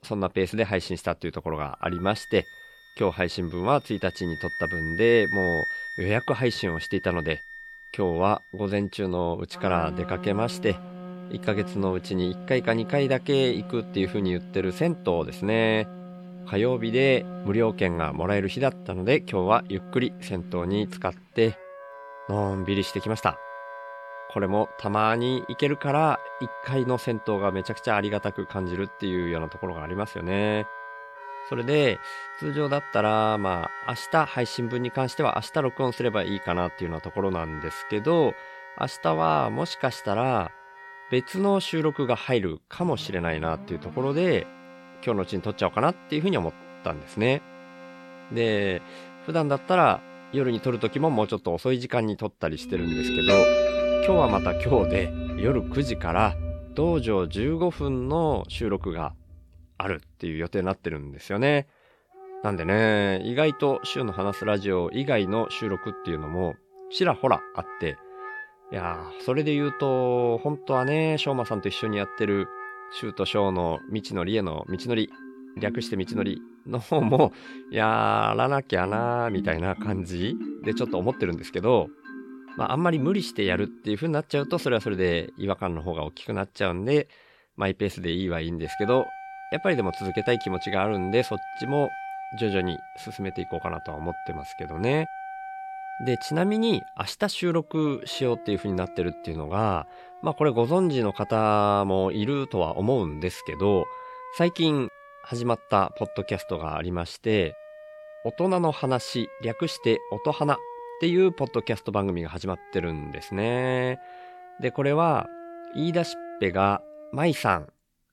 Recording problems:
background music; loud; throughout; 10 dB below the speech

